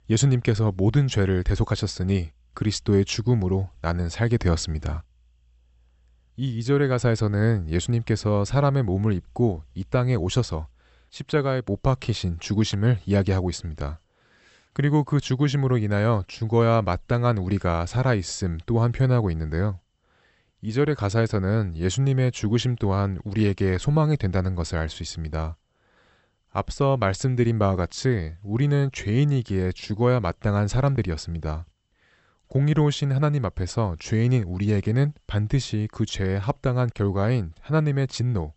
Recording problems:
high frequencies cut off; noticeable; nothing above 8 kHz

